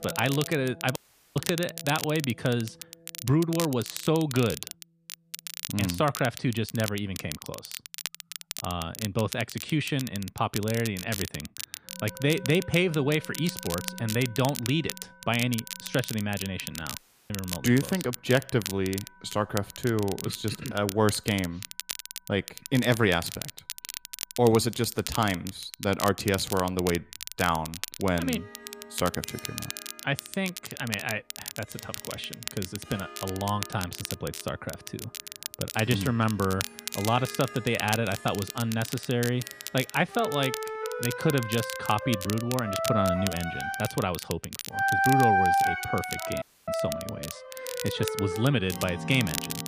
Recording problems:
background music; loud; throughout; 4 dB below the speech
crackle, like an old record; loud; 9 dB below the speech
audio cutting out; at 1 s, at 17 s and at 46 s

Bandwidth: 15 kHz